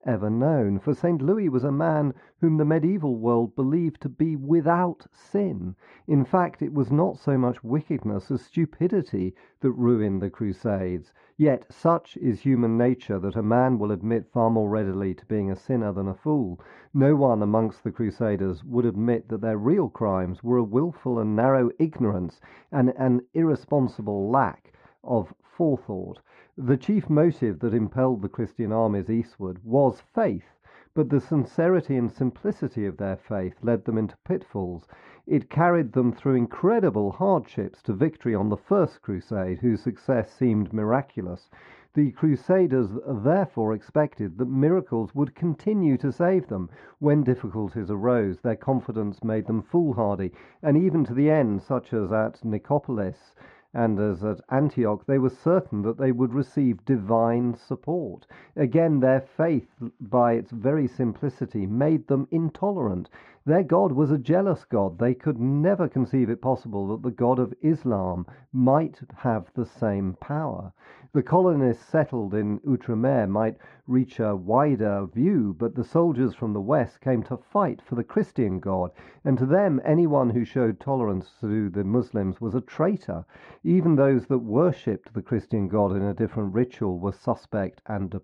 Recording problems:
muffled; very; fading above 3.5 kHz

